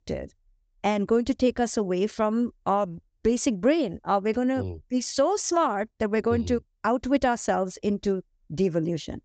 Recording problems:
high frequencies cut off; noticeable; nothing above 8 kHz

